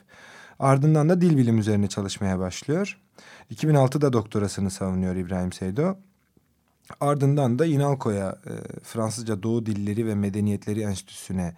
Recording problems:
none

